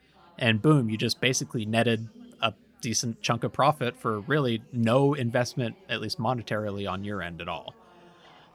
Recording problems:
background chatter; faint; throughout; 4 voices, 30 dB below the speech

